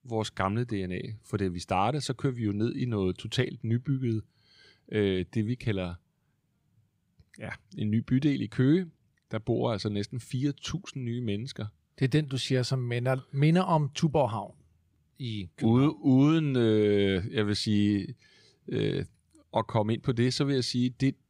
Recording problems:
none

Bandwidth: 15.5 kHz